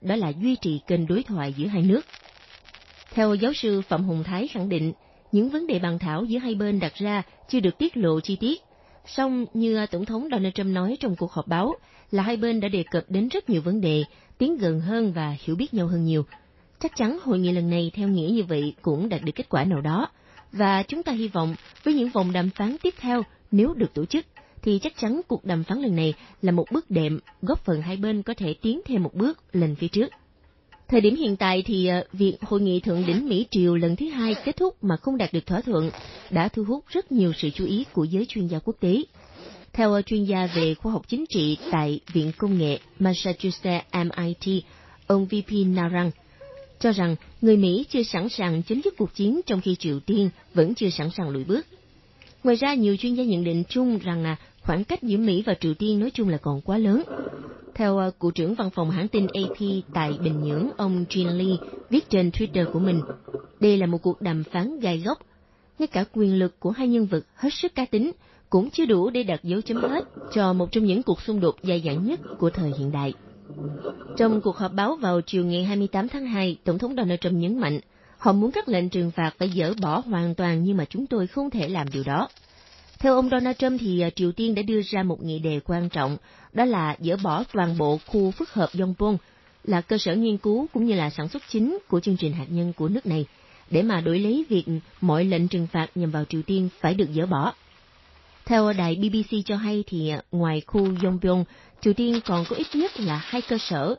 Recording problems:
garbled, watery; slightly; nothing above 5.5 kHz
household noises; noticeable; throughout; 15 dB below the speech
crackling; faint; 4 times, first at 1.5 s; 25 dB below the speech

